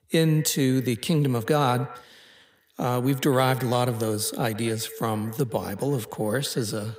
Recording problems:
echo of what is said; noticeable; throughout; 110 ms later, 15 dB below the speech

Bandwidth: 15.5 kHz